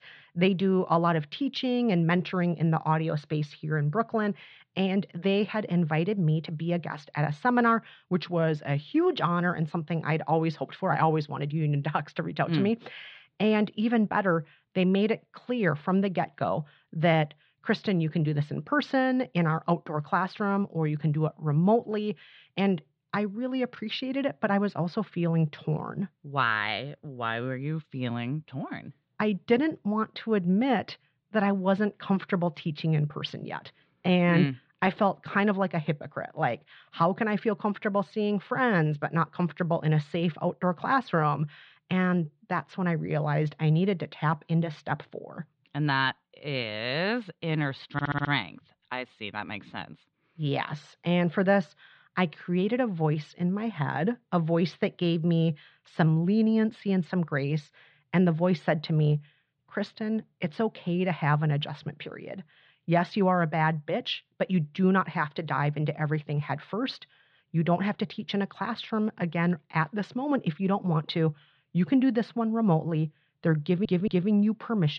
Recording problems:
muffled; slightly; fading above 4 kHz
audio stuttering; at 48 s and at 1:14
abrupt cut into speech; at the end

